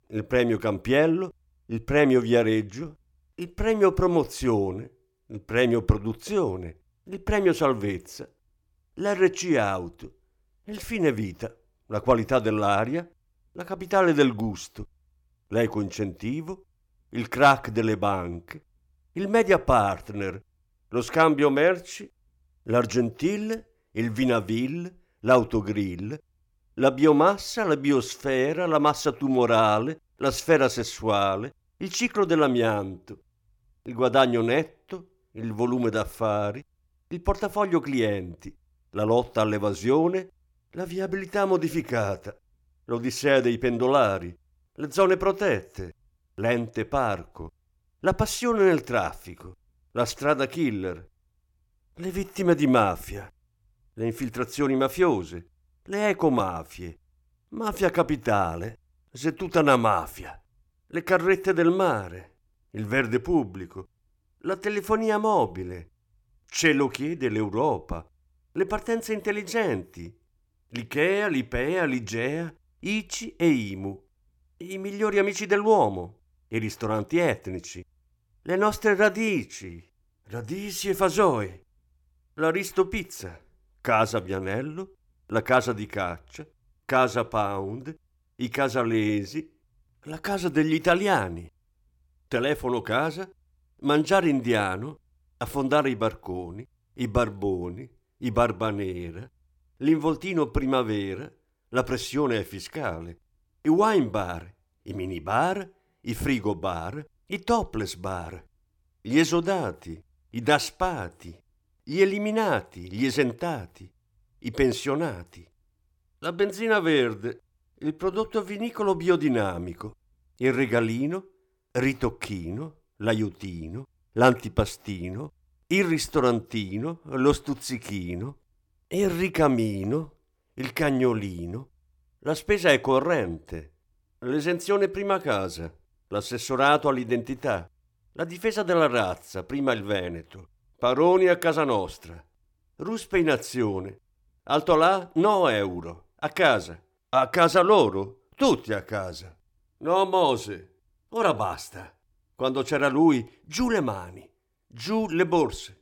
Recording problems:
none

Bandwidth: 18 kHz